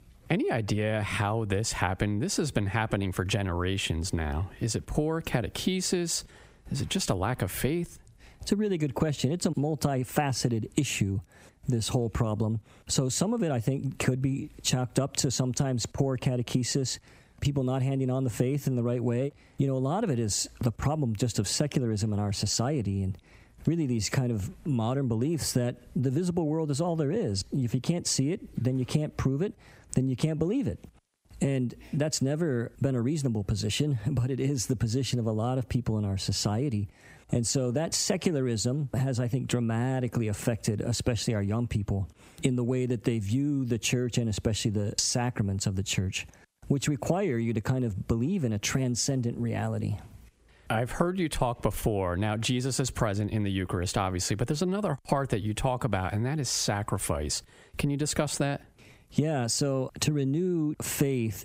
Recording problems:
squashed, flat; heavily

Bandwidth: 15.5 kHz